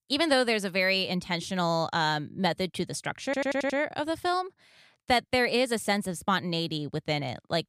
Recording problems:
audio stuttering; at 3.5 s

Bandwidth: 15 kHz